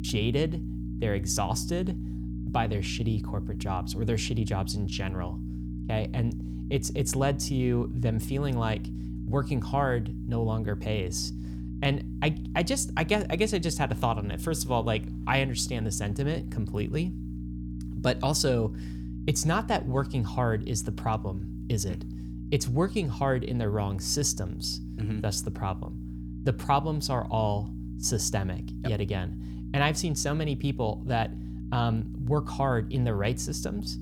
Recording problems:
electrical hum; noticeable; throughout; 60 Hz, 15 dB below the speech

